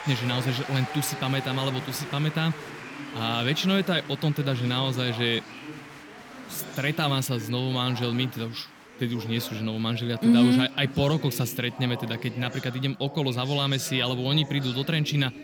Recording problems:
chatter from many people; noticeable; throughout; 15 dB below the speech

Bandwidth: 18.5 kHz